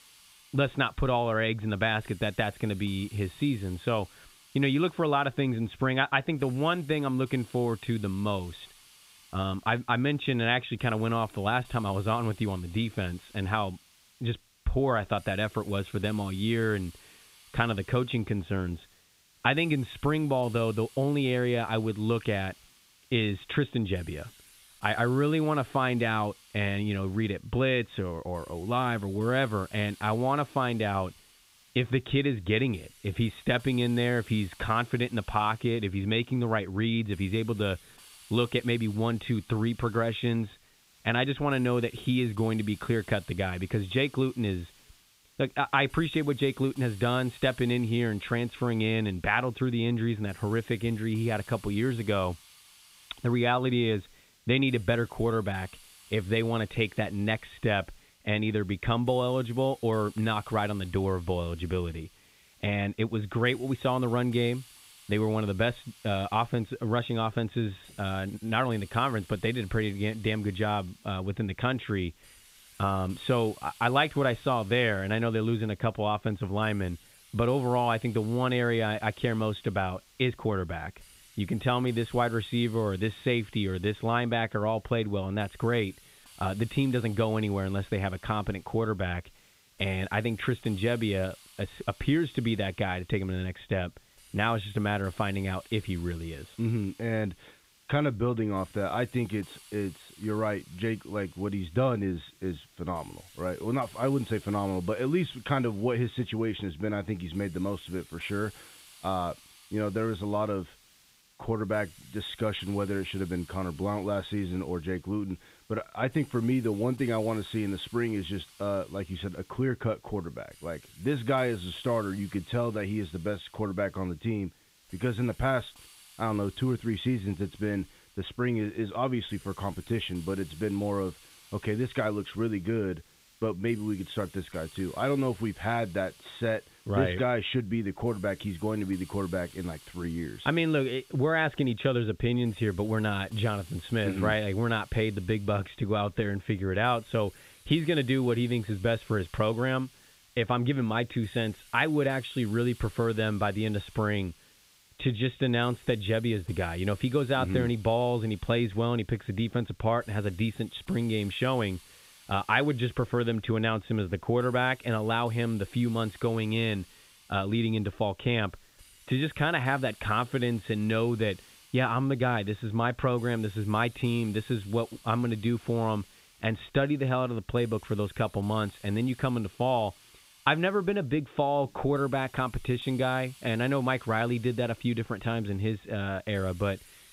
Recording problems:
high frequencies cut off; severe; nothing above 4 kHz
hiss; faint; throughout; 25 dB below the speech

